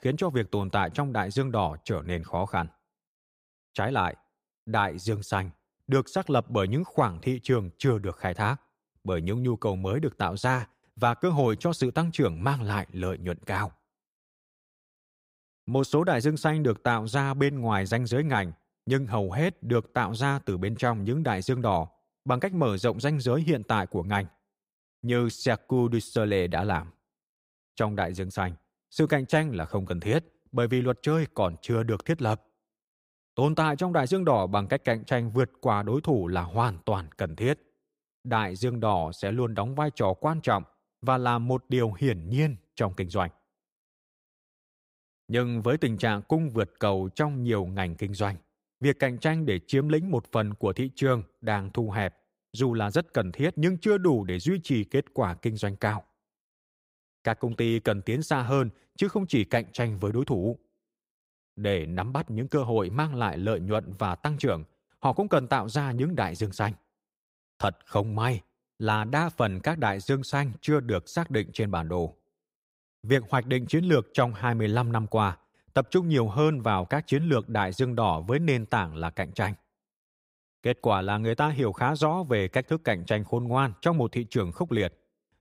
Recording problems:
none

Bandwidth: 15.5 kHz